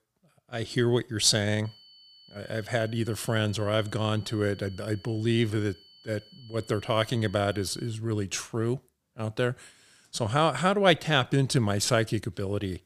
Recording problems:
high-pitched whine; faint; from 1.5 to 8 s; 4.5 kHz, 25 dB below the speech

